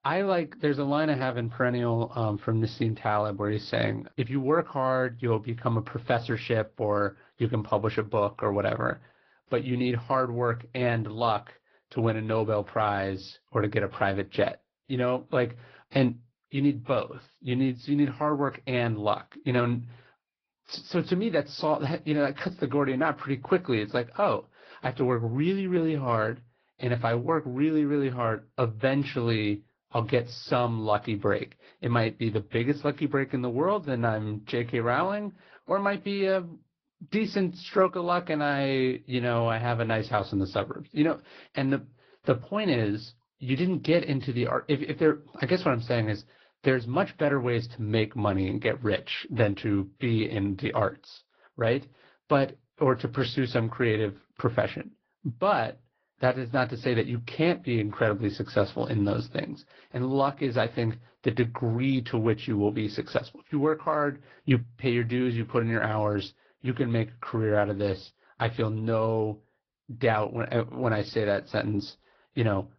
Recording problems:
high frequencies cut off; noticeable; nothing above 5.5 kHz
garbled, watery; slightly

